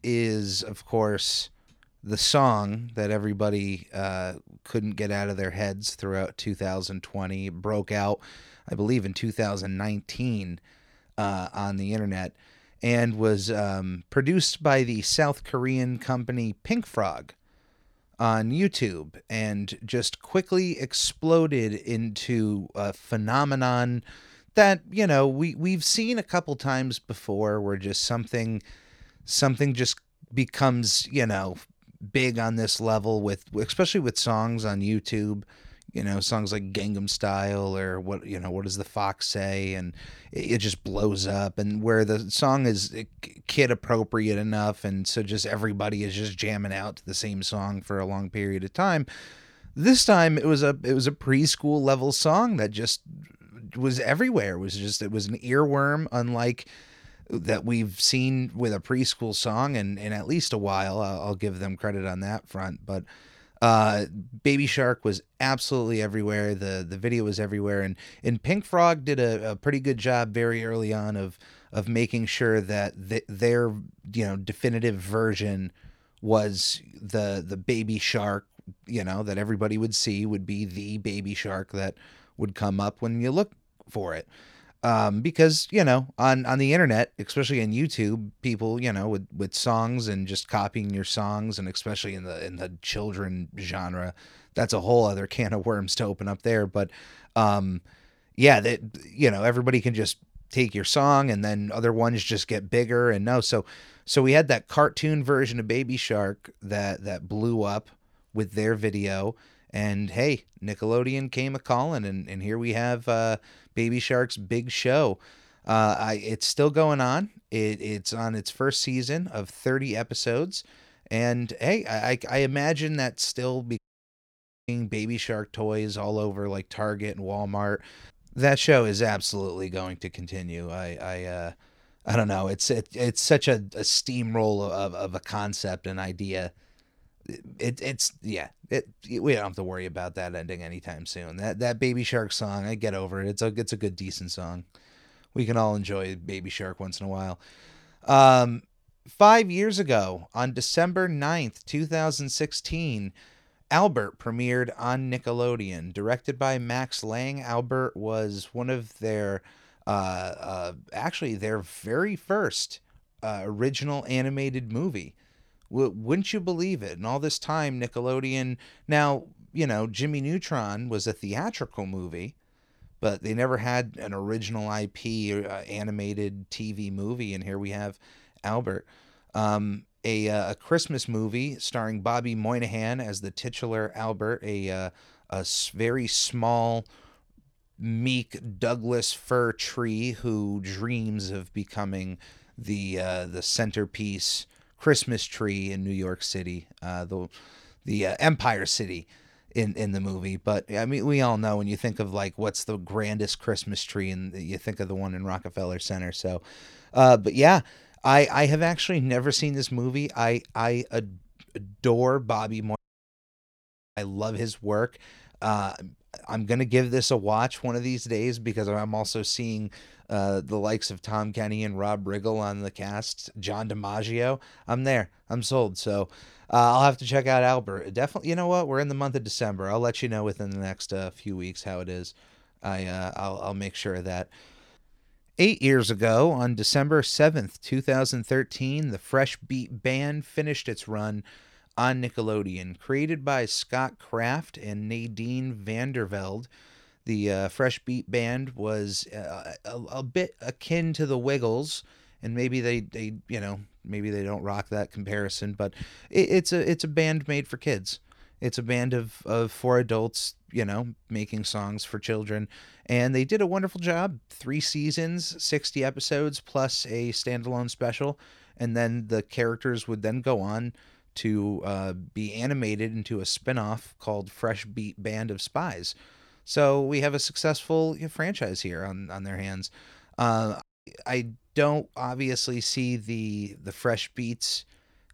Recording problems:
audio cutting out; at 2:04 for 1 s, at 3:33 for 1 s and at 4:41

